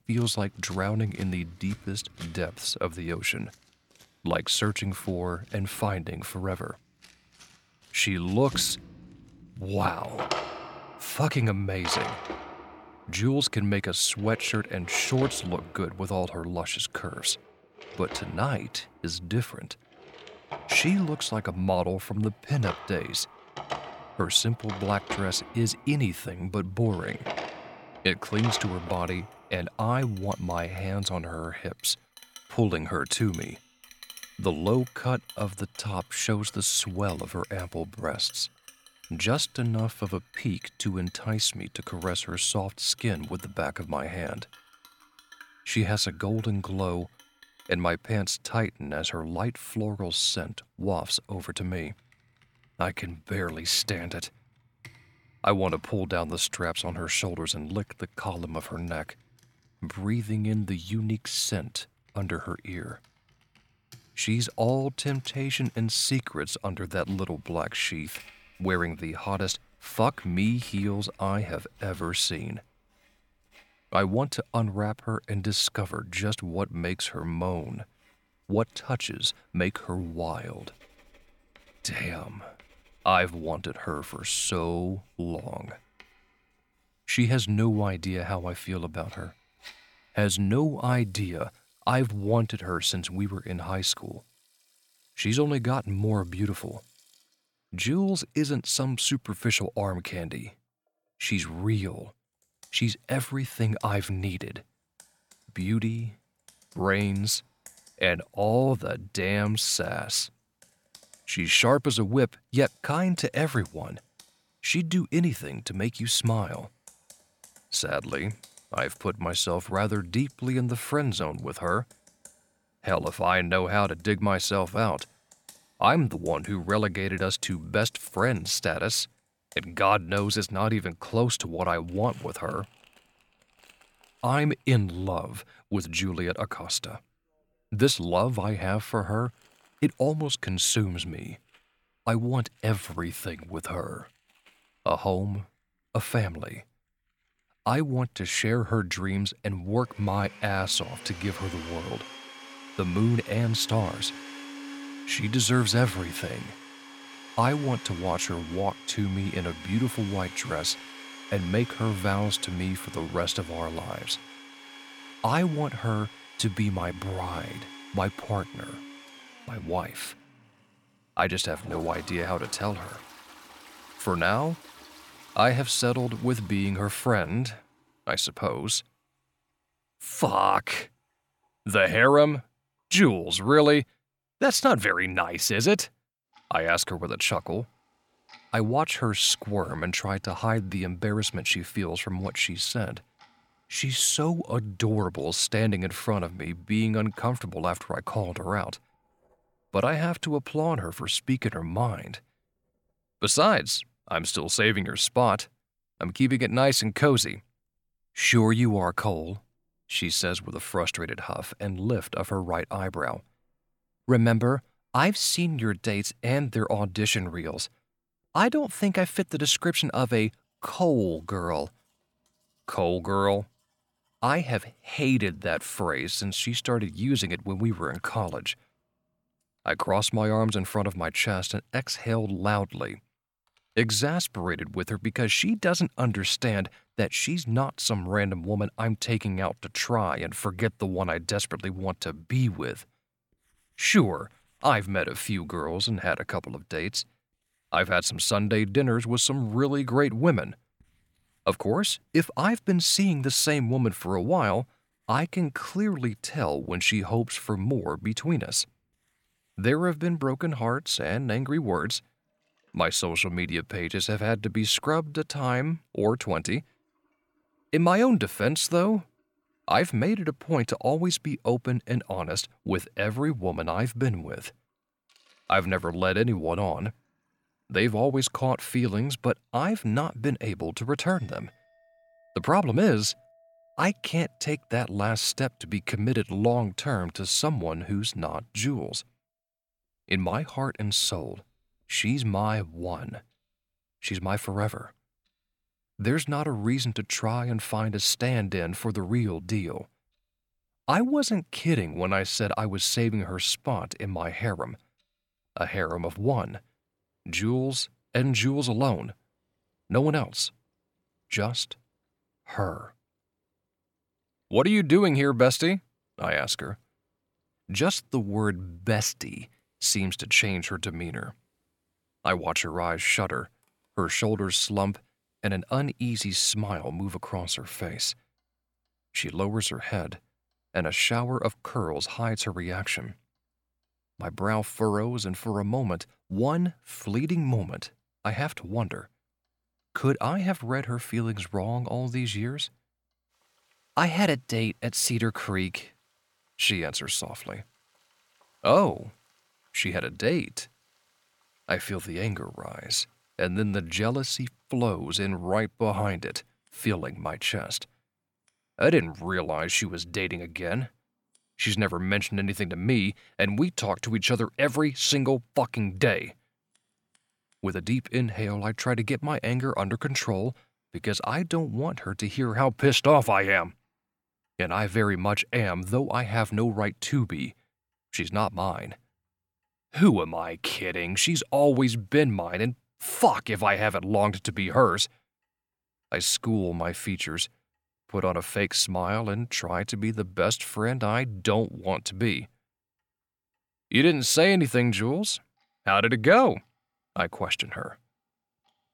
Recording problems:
household noises; noticeable; throughout; 20 dB below the speech

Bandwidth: 17.5 kHz